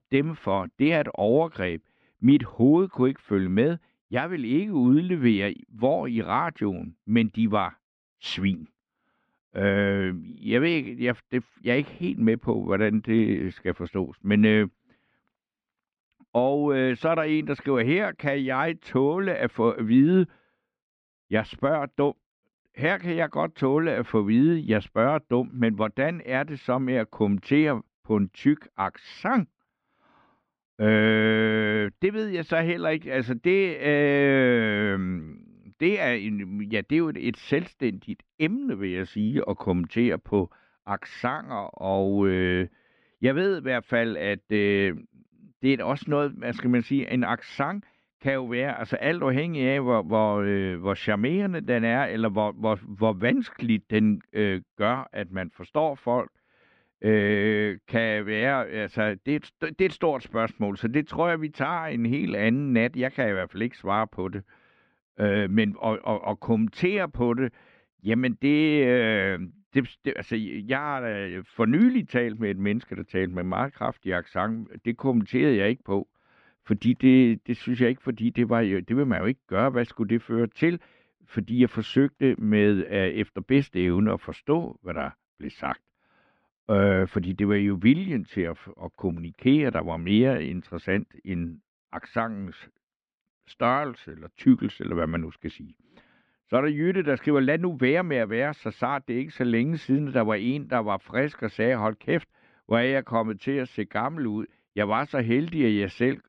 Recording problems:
muffled; slightly; fading above 3.5 kHz

